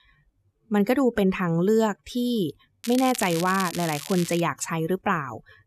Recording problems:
crackling; noticeable; from 3 to 4.5 s; 10 dB below the speech

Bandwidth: 13.5 kHz